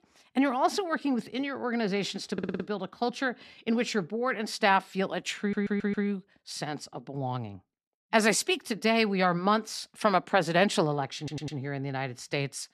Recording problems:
audio stuttering; at 2.5 s, at 5.5 s and at 11 s

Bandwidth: 13.5 kHz